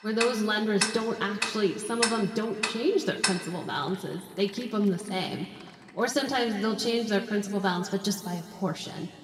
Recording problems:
room echo; noticeable; dies away in 1.8 s
off-mic speech; somewhat distant
household noises; very faint; until 6.5 s; 2 dB below the speech

